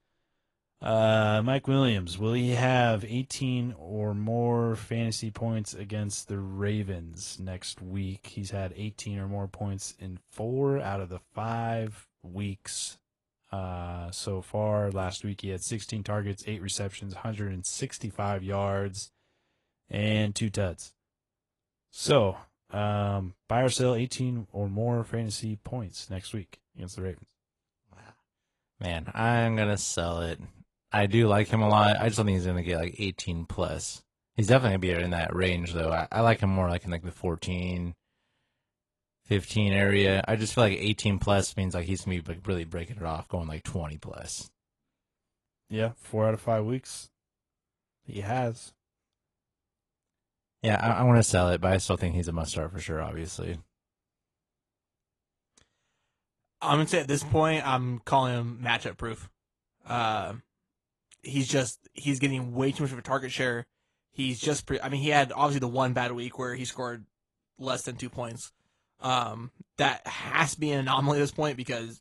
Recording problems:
garbled, watery; slightly

